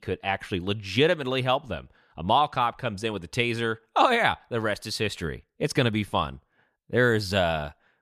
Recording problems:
none

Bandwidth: 14.5 kHz